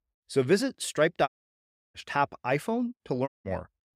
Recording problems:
audio cutting out; at 1.5 s for 0.5 s and at 3.5 s

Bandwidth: 15.5 kHz